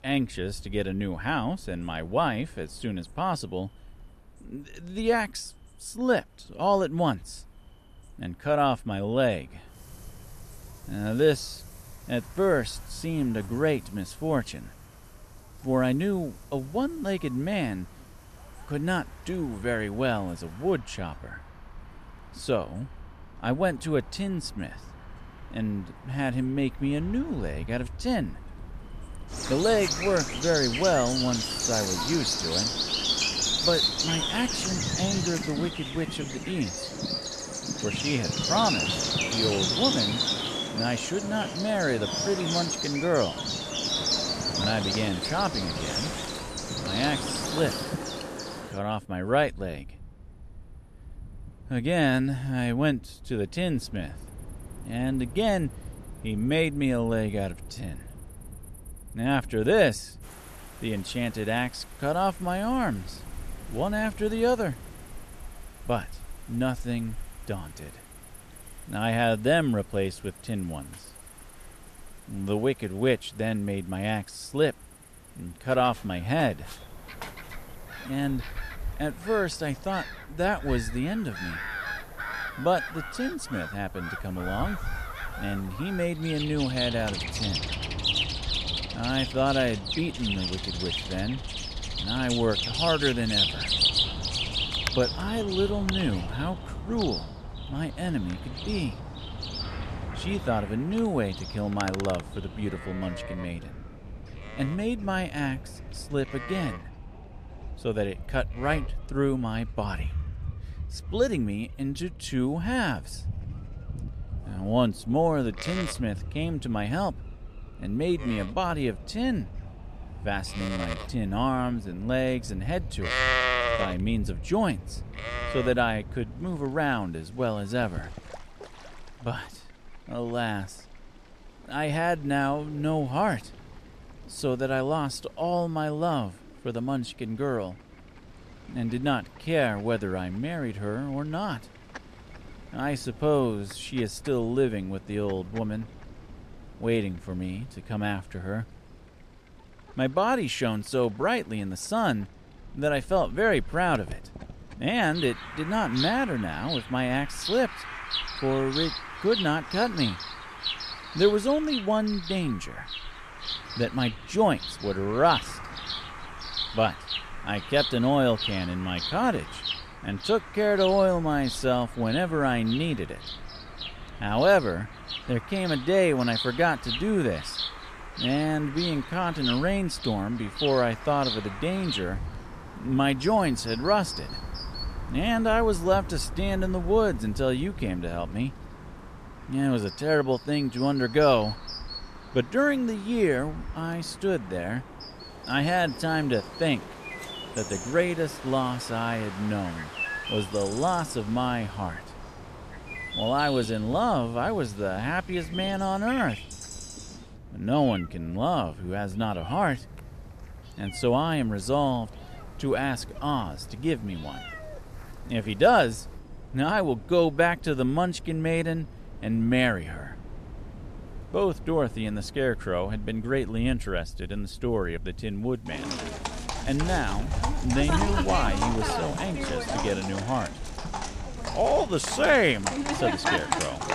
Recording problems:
animal sounds; loud; throughout; 4 dB below the speech
wind in the background; noticeable; throughout; 15 dB below the speech

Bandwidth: 14 kHz